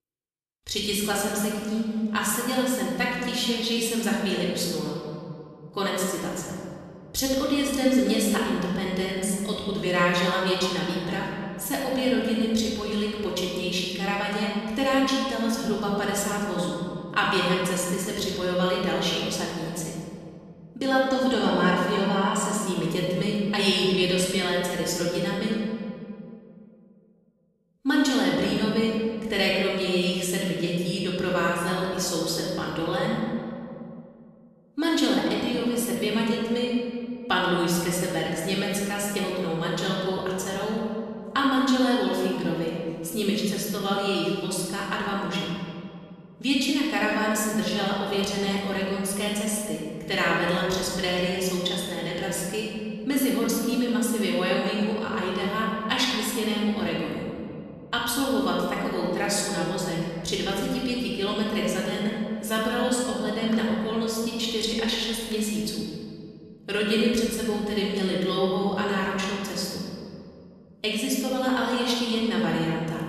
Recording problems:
off-mic speech; far
room echo; noticeable; dies away in 2.2 s

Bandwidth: 13.5 kHz